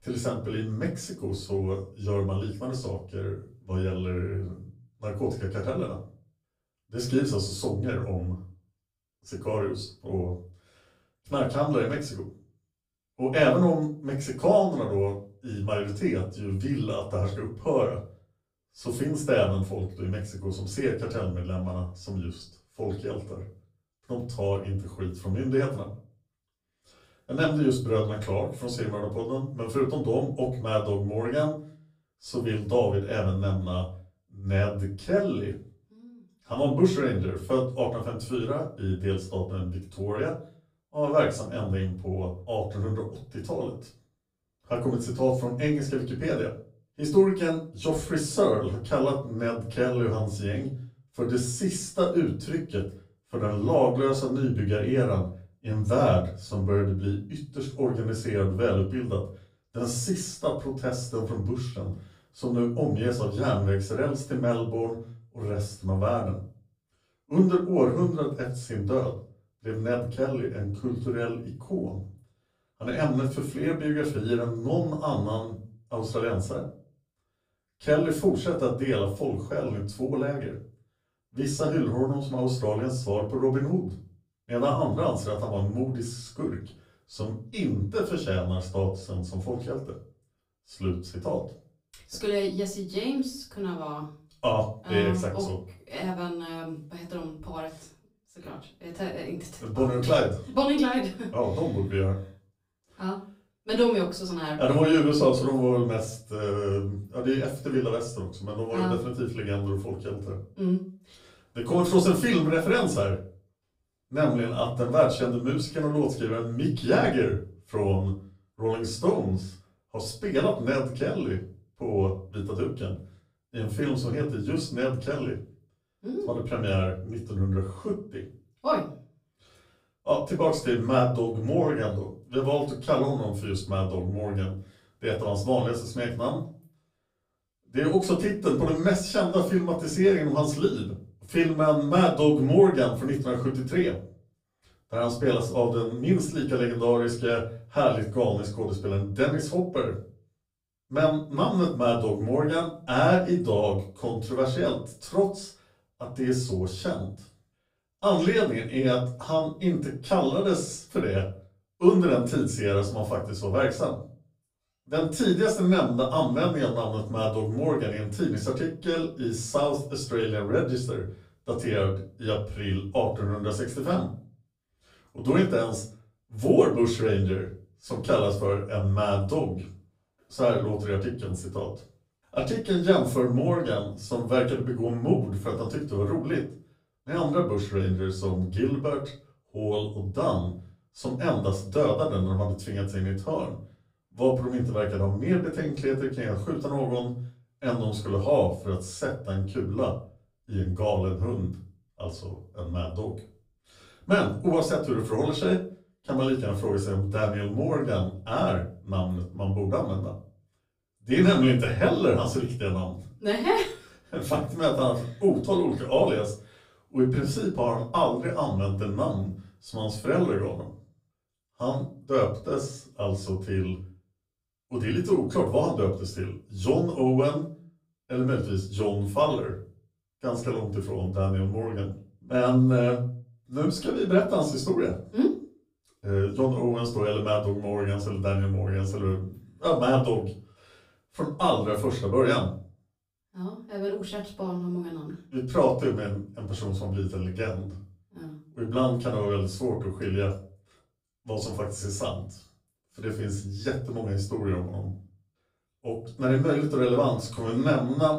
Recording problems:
off-mic speech; far
room echo; slight; dies away in 0.3 s

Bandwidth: 15.5 kHz